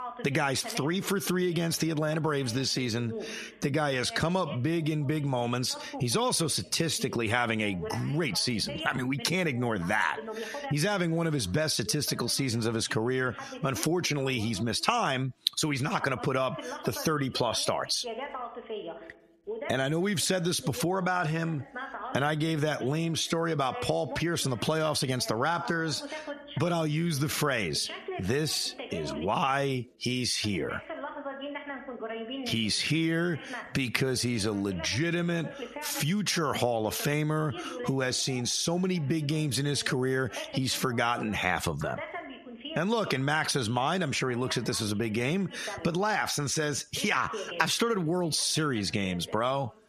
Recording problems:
squashed, flat; heavily, background pumping
voice in the background; noticeable; throughout; 15 dB below the speech

